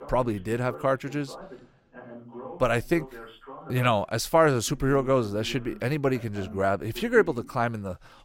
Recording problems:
background chatter; noticeable; throughout; 2 voices, 20 dB below the speech

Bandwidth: 16.5 kHz